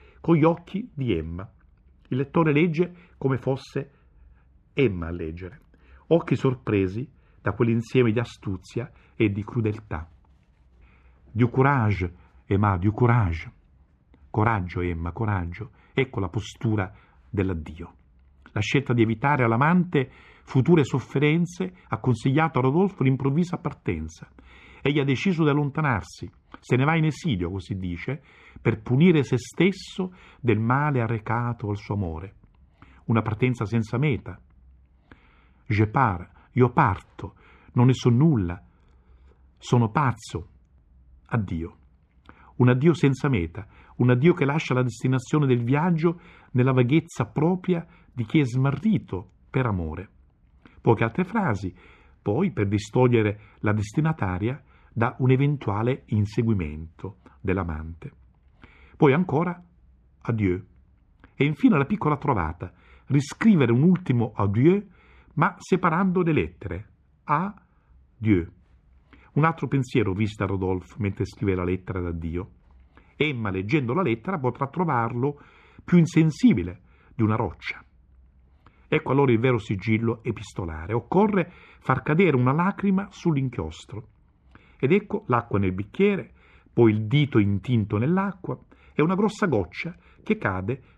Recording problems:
muffled; very; fading above 3.5 kHz

